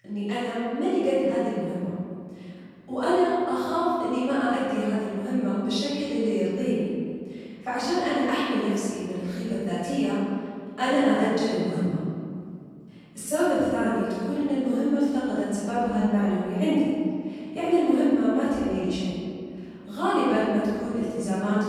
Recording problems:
room echo; strong; dies away in 2 s
off-mic speech; far

